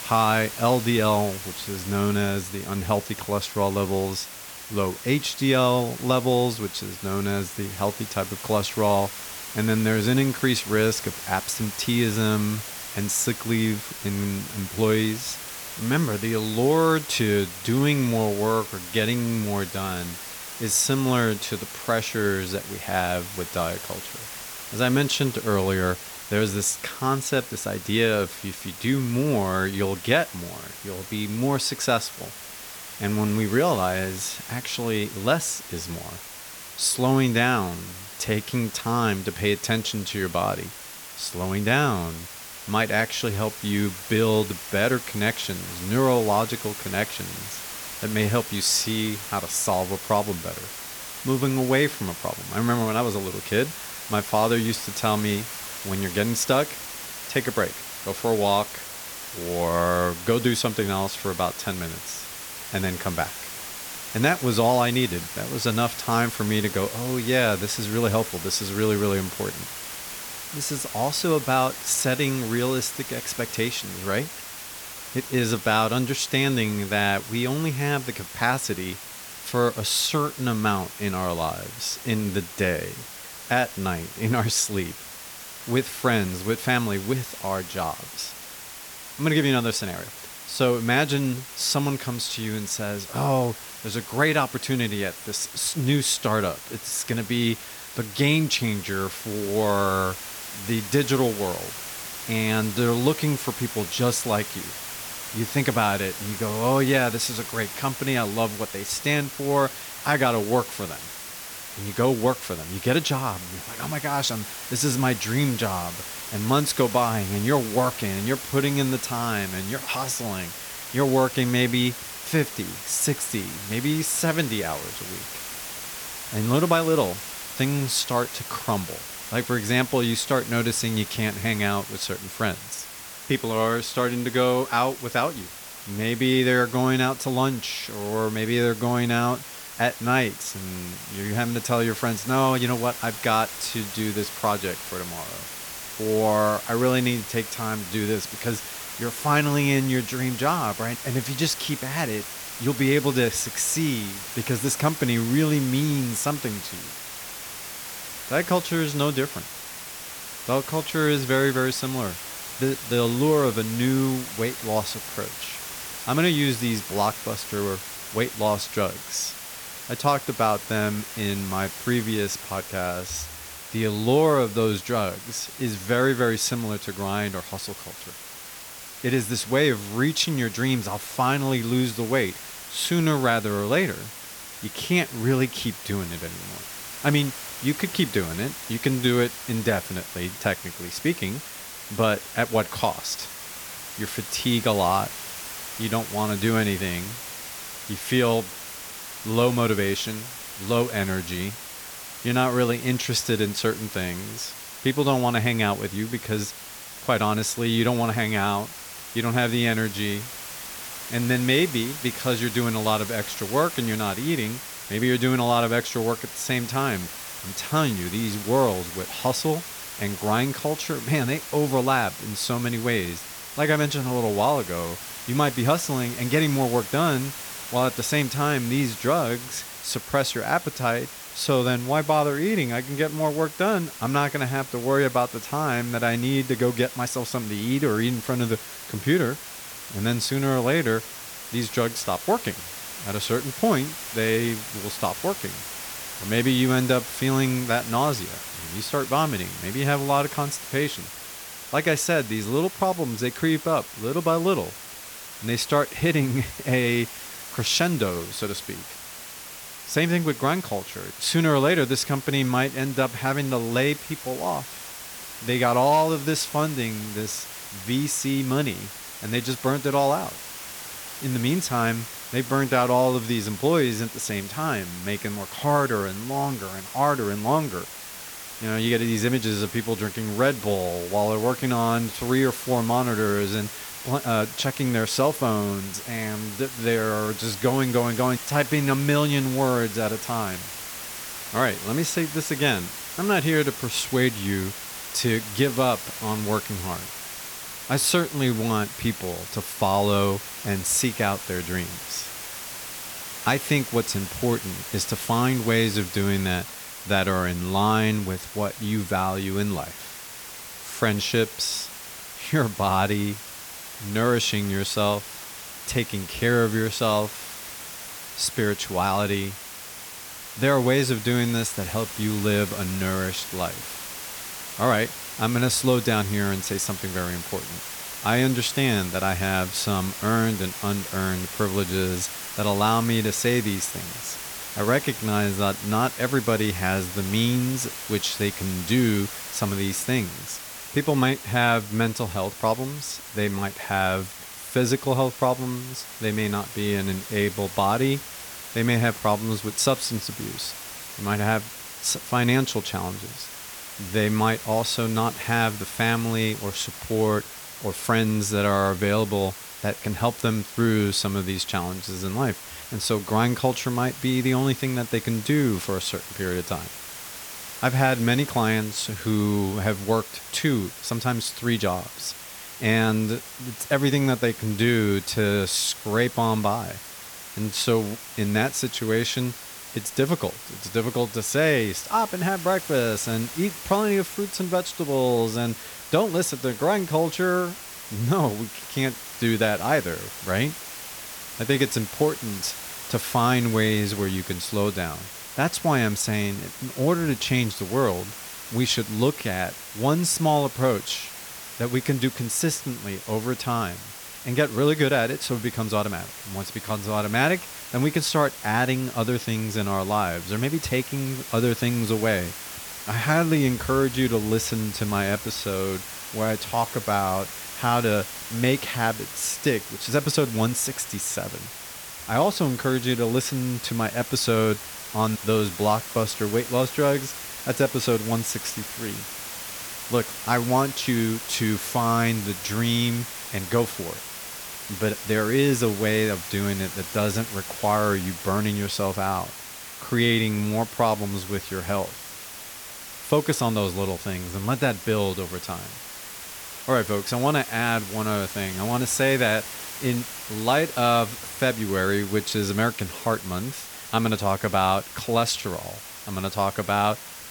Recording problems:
hiss; loud; throughout; 10 dB below the speech

